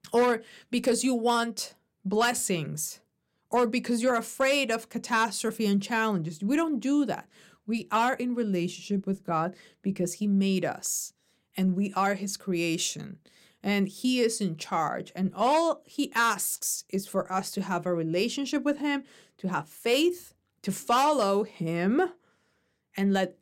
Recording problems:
none

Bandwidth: 16 kHz